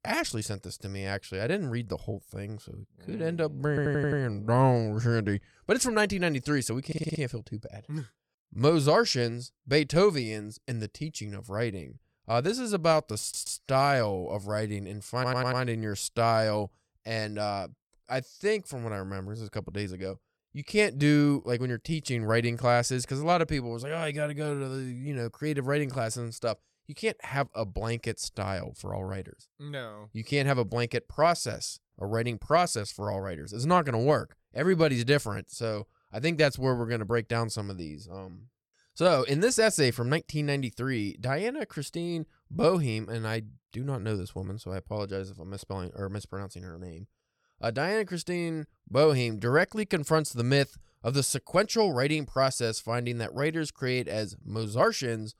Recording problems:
audio stuttering; 4 times, first at 3.5 s

